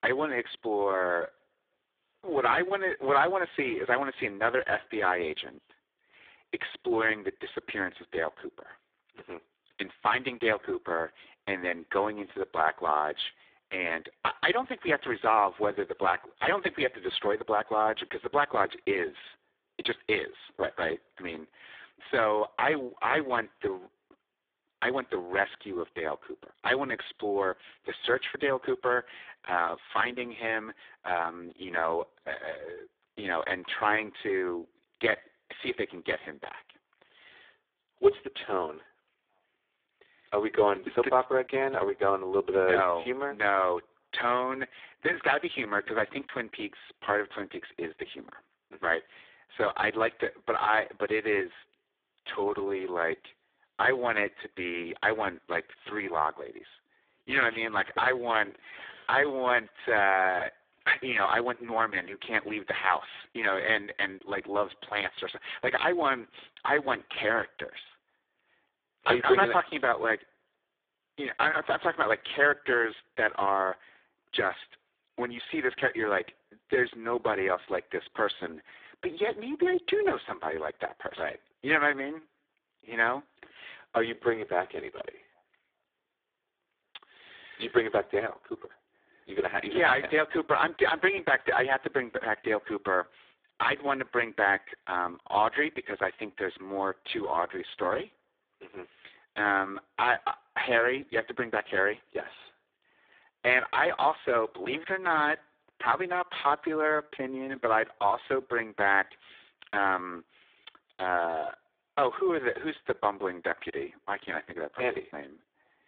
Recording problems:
phone-call audio; poor line; nothing above 3.5 kHz

